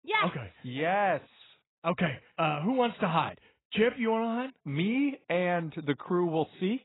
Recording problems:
garbled, watery; badly; nothing above 4 kHz

